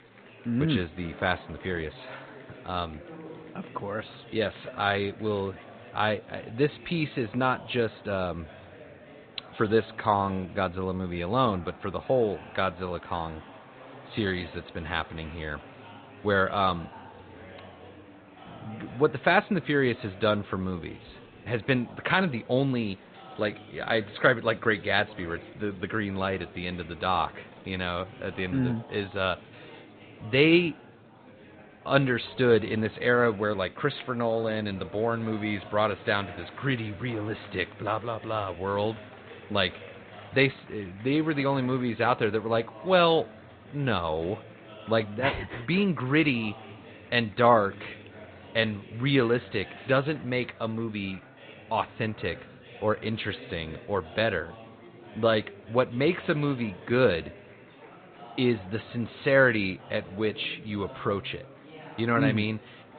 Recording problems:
high frequencies cut off; severe; nothing above 4 kHz
garbled, watery; slightly
murmuring crowd; noticeable; throughout; 20 dB below the speech

